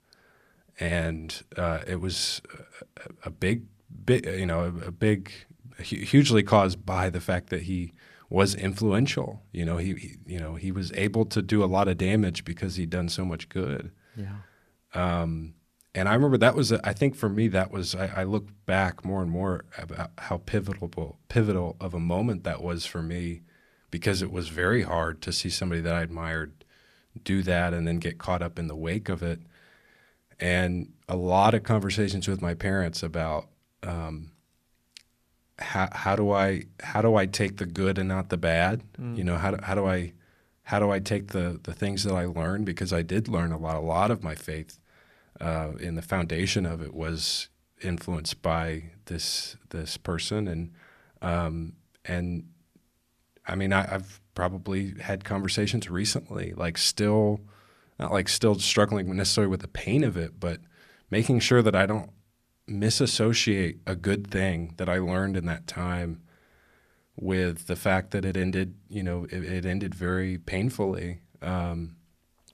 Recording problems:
none

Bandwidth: 14.5 kHz